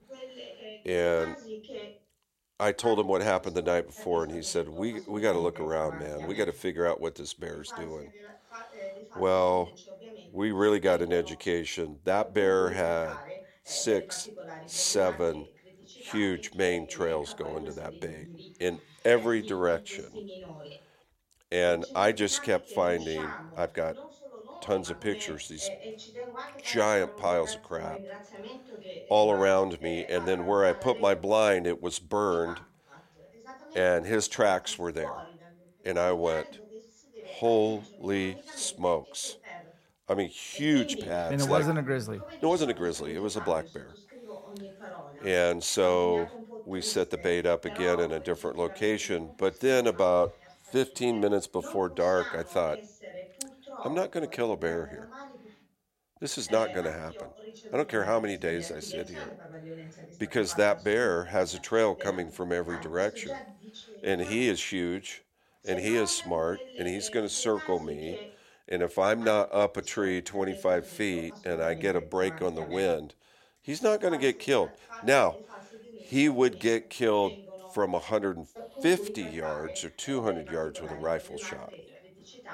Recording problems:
voice in the background; noticeable; throughout; 15 dB below the speech

